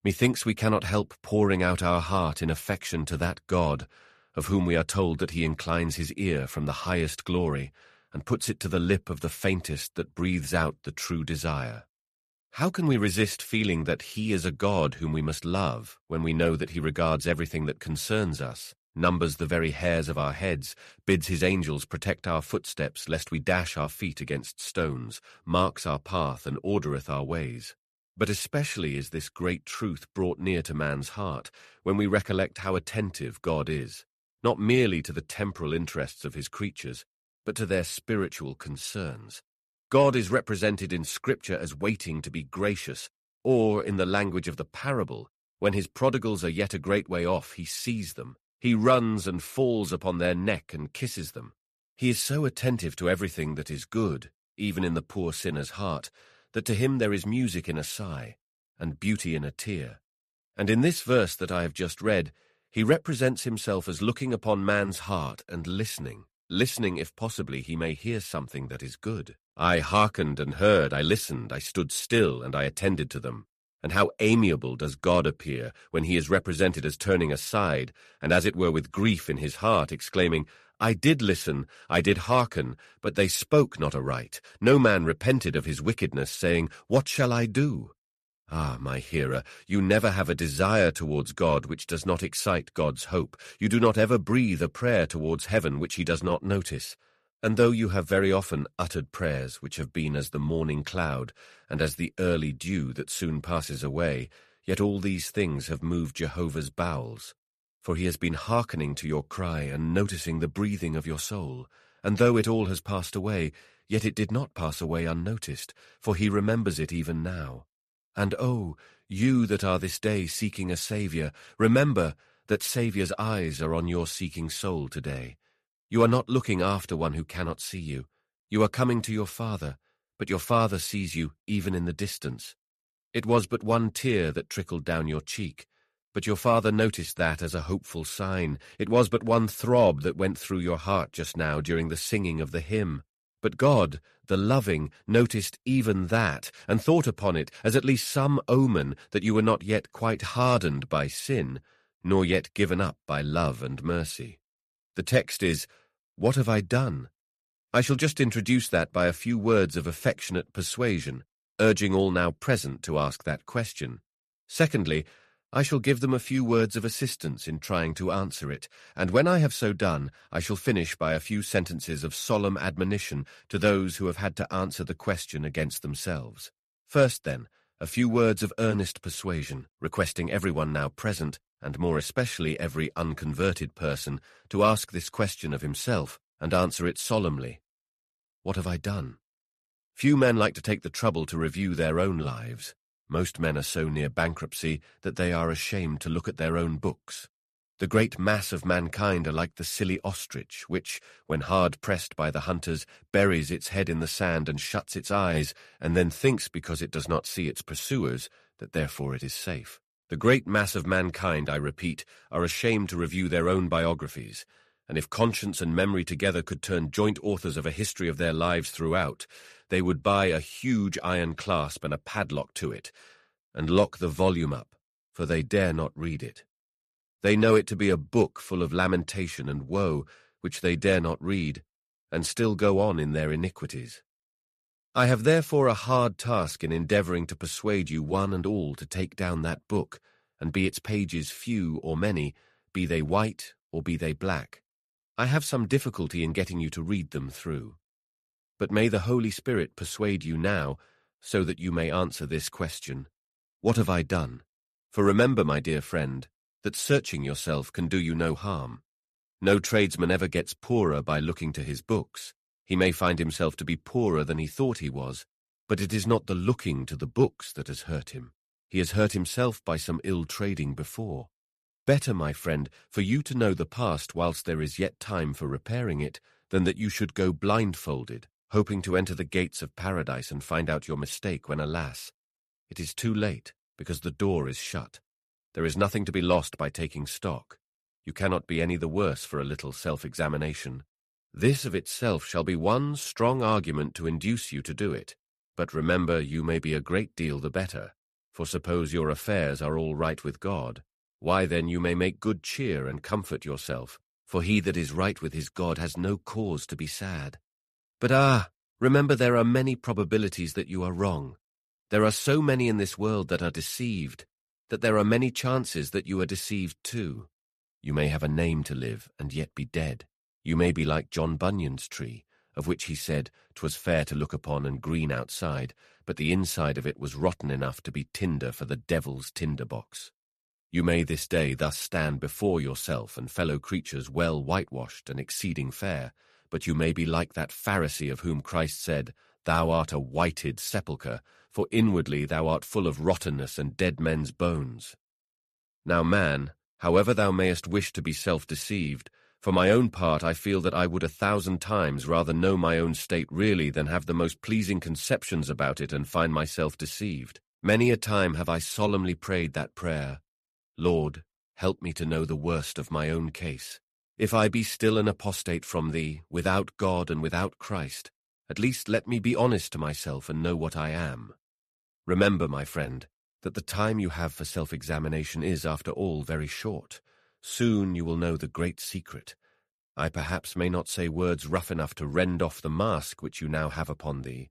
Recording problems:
none

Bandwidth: 14 kHz